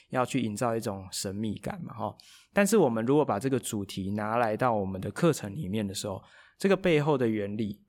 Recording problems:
none

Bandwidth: 18 kHz